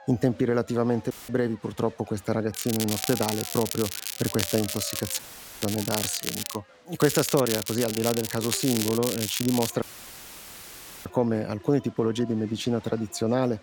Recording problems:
crackling; loud; from 2.5 to 6.5 s and from 7 to 9.5 s; 4 dB below the speech
crowd noise; faint; throughout; 20 dB below the speech
audio cutting out; filled with static; at 1 s, at 5 s and at 10 s for 1 s

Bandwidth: 17.5 kHz